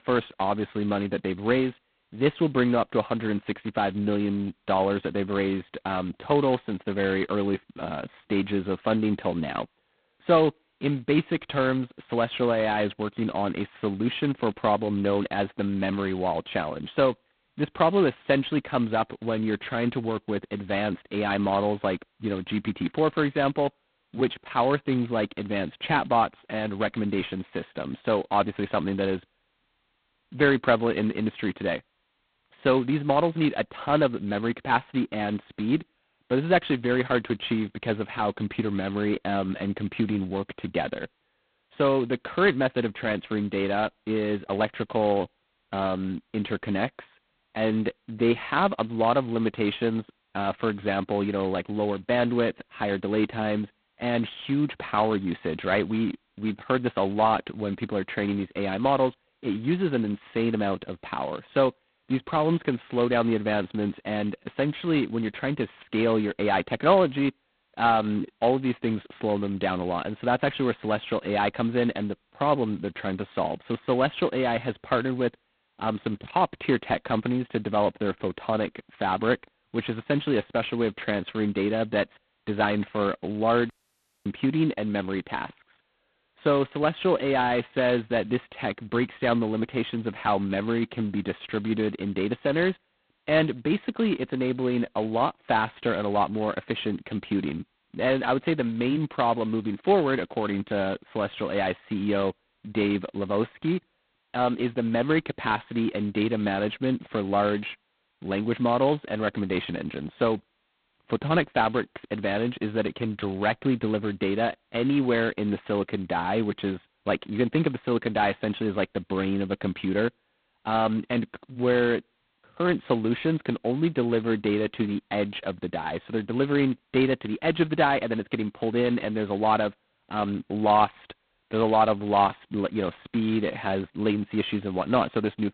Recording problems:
phone-call audio; poor line; nothing above 4 kHz
audio cutting out; at 1:24 for 0.5 s

